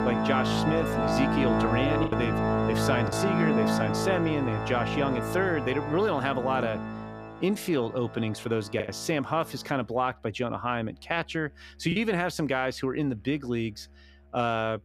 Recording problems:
background music; very loud; throughout; 1 dB above the speech
choppy; occasionally; from 2 to 3 s and from 9 to 12 s; 2% of the speech affected

